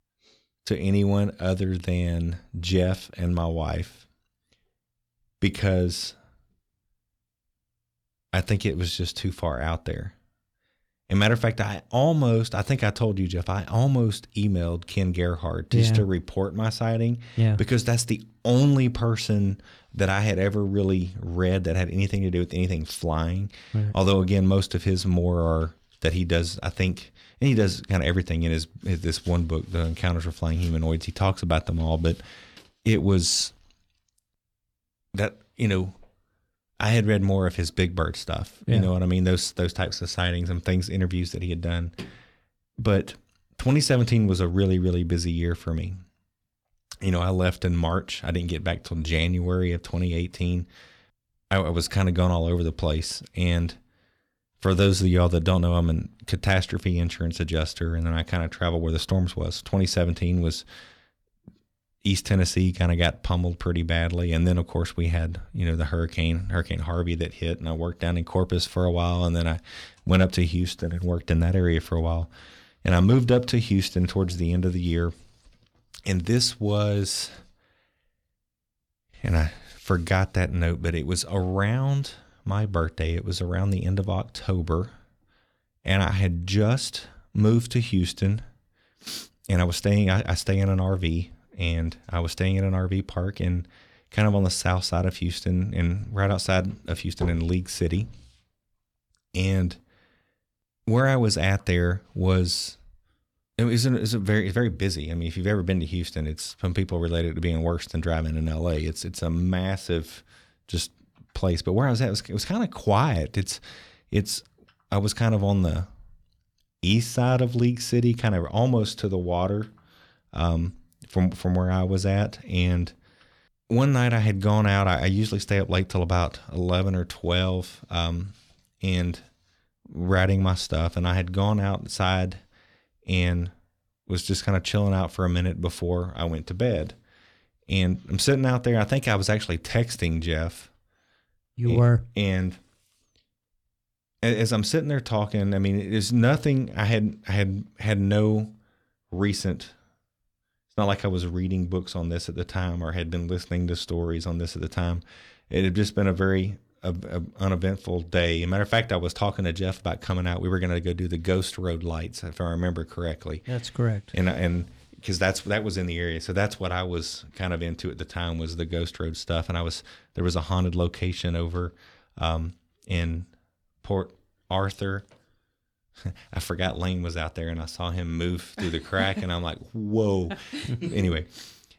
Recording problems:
none

